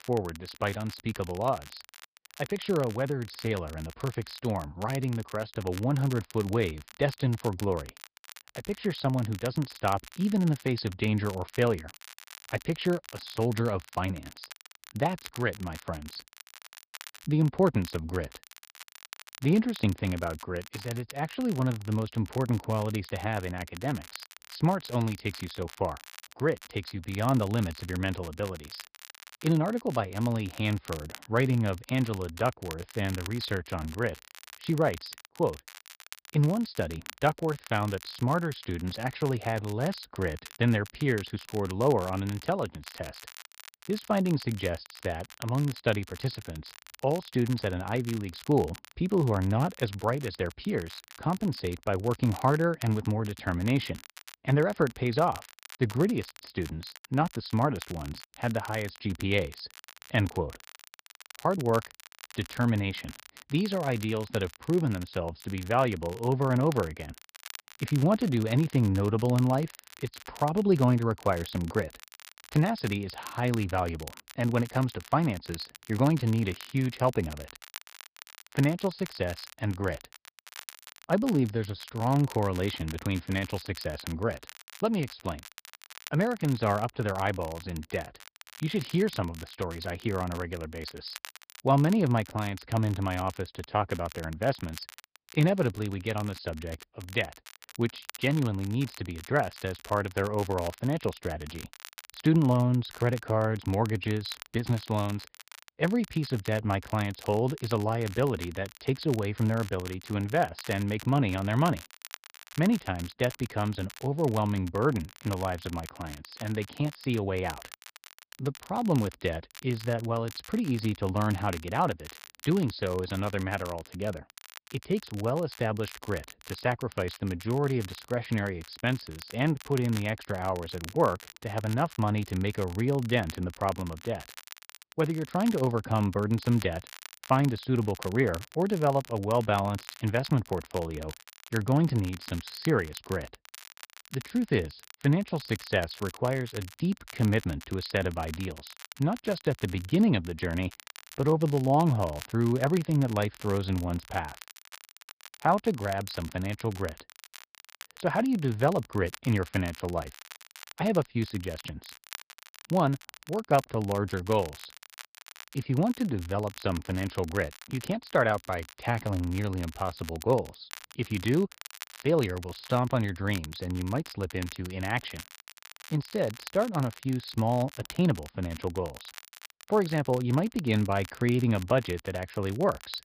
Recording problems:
high frequencies cut off; noticeable; nothing above 5 kHz
garbled, watery; slightly
crackle, like an old record; noticeable; 15 dB below the speech

